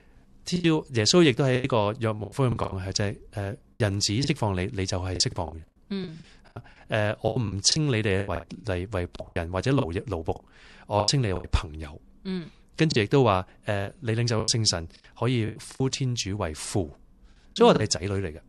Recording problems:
choppy; very; 12% of the speech affected

